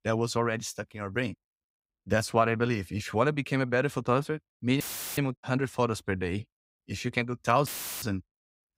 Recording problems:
audio cutting out; filled with static; at 5 s and at 7.5 s

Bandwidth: 15.5 kHz